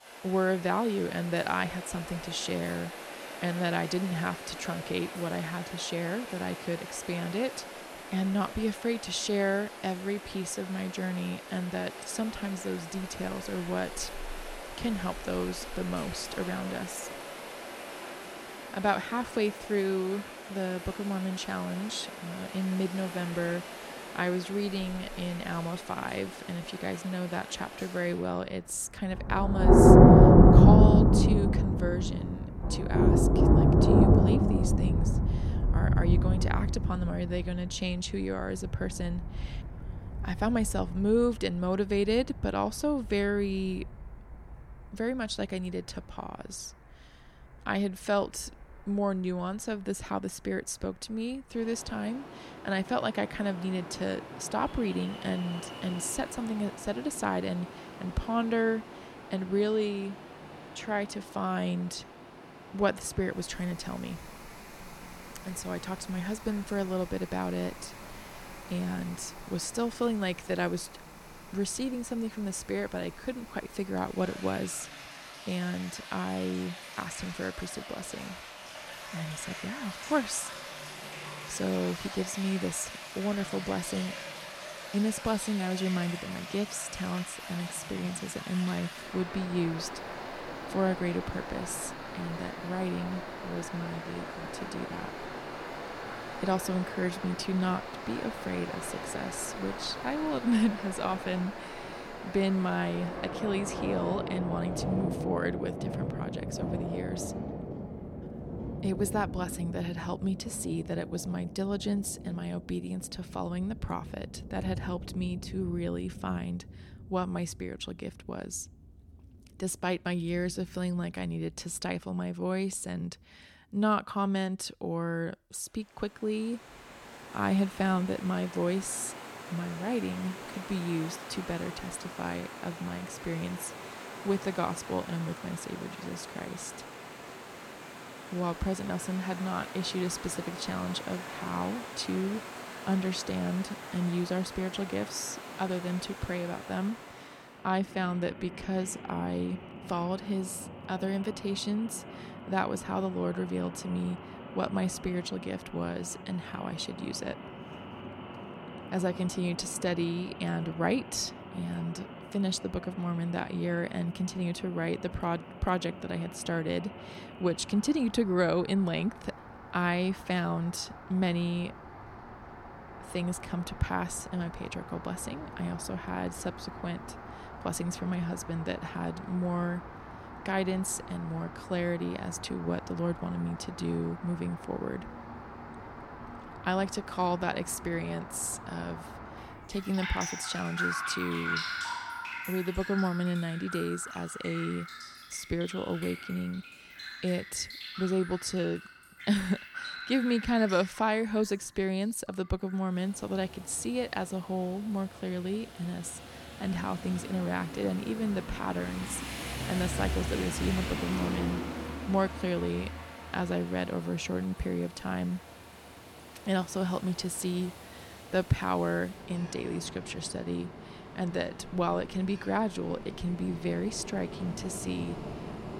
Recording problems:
rain or running water; very loud; throughout; as loud as the speech

